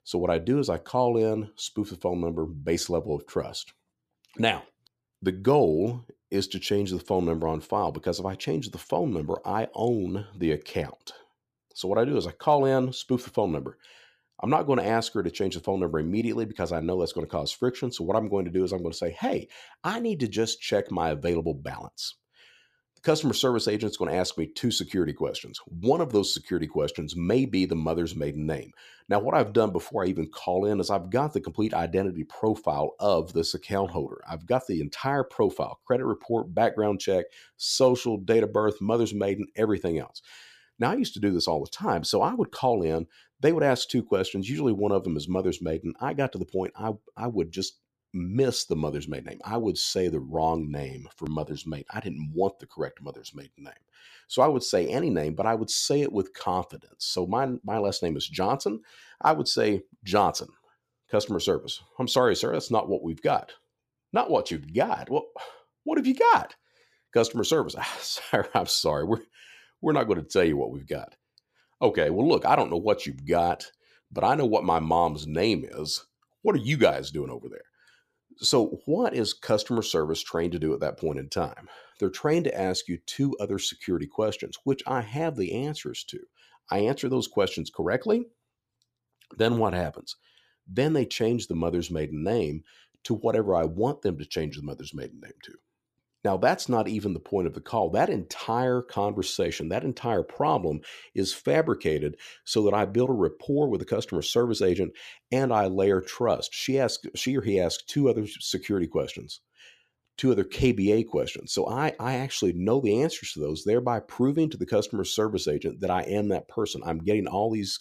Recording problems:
none

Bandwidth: 14.5 kHz